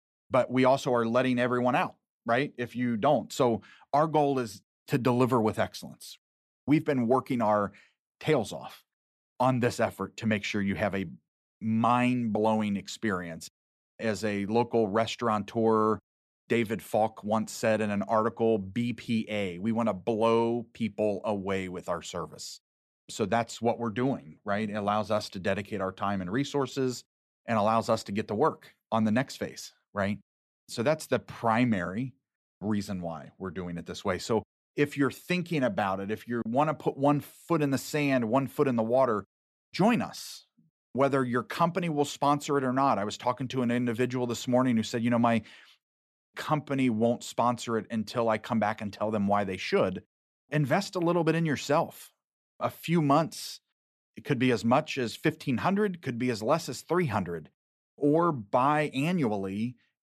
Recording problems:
none

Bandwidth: 13.5 kHz